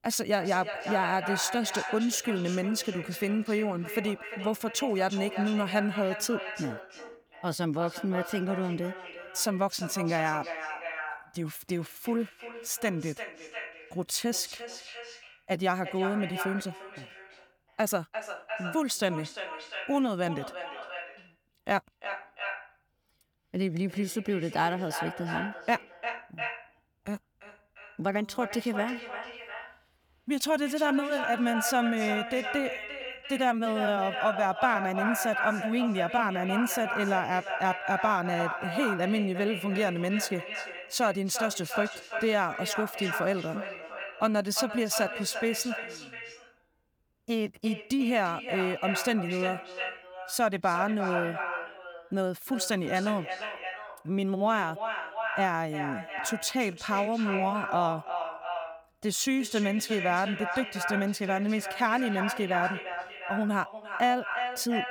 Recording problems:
echo of what is said; strong; throughout; 350 ms later, 7 dB below the speech

